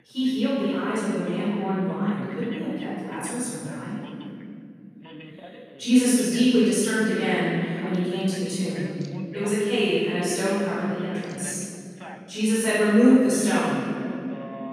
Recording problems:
room echo; strong; dies away in 2.5 s
off-mic speech; far
voice in the background; faint; throughout; 20 dB below the speech

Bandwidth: 15 kHz